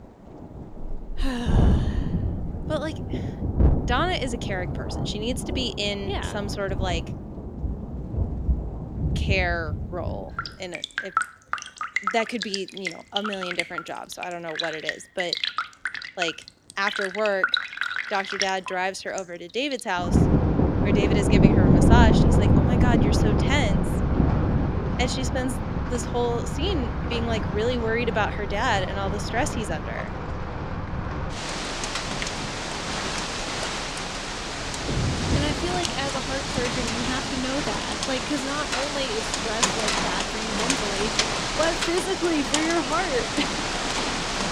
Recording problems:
rain or running water; very loud; throughout; 3 dB above the speech

